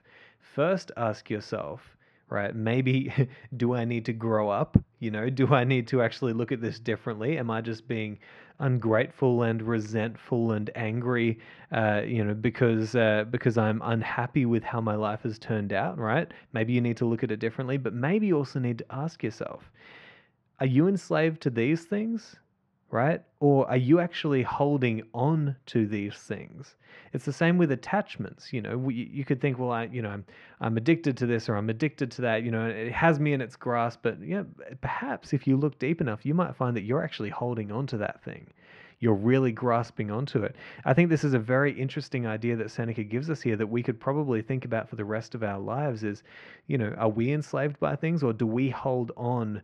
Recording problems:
muffled; very; fading above 2.5 kHz

